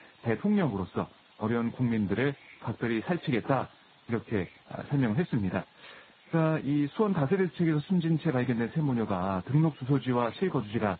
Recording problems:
garbled, watery; badly; nothing above 4 kHz
hiss; faint; throughout; 25 dB below the speech

